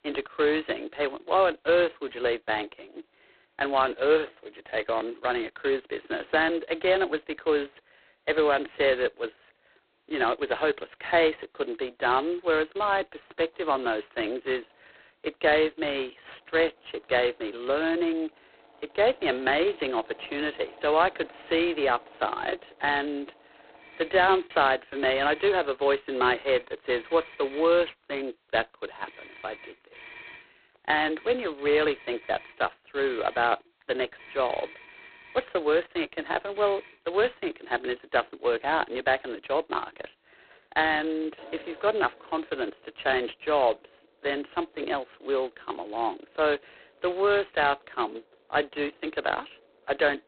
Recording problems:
phone-call audio; poor line; nothing above 4 kHz
muffled; very slightly; fading above 3 kHz
traffic noise; faint; throughout; 25 dB below the speech
choppy; occasionally; from 23 to 25 s; 1% of the speech affected

